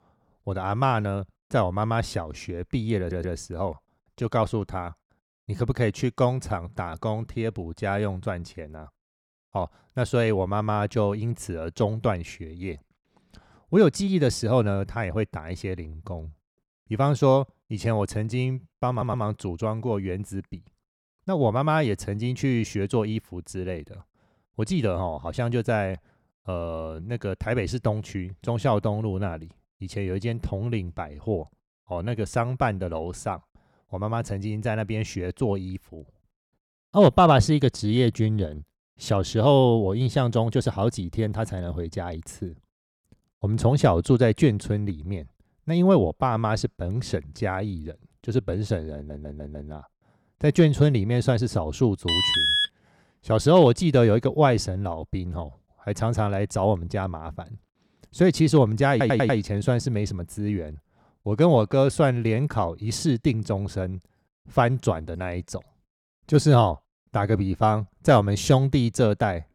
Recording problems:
audio stuttering; 4 times, first at 3 s
alarm; loud; at 52 s; peak 6 dB above the speech

